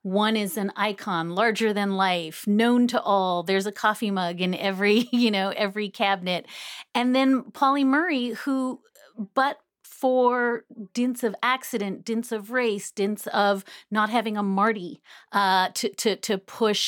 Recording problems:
abrupt cut into speech; at the end

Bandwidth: 17.5 kHz